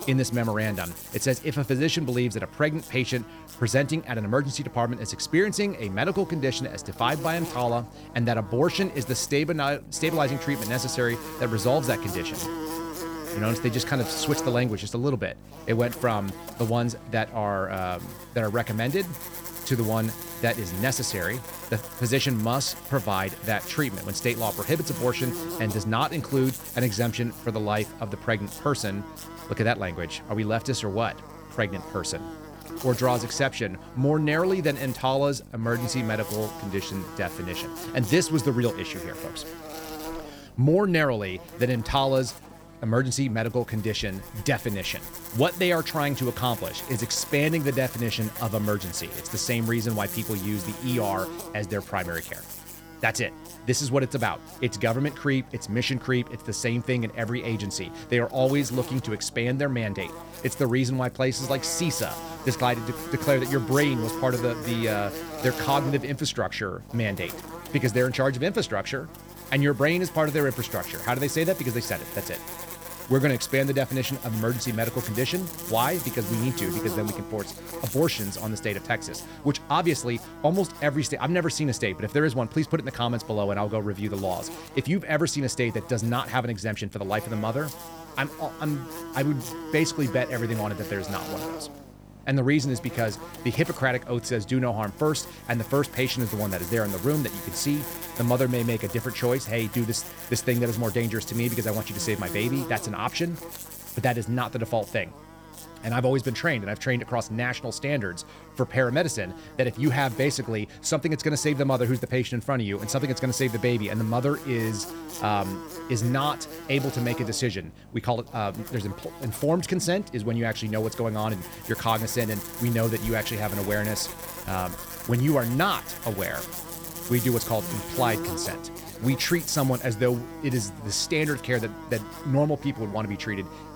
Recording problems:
electrical hum; noticeable; throughout; 50 Hz, 10 dB below the speech

